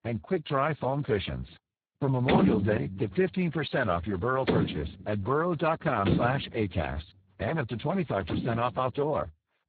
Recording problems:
garbled, watery; badly; nothing above 4 kHz
door banging; loud; from 2.5 to 8.5 s; peak 5 dB above the speech

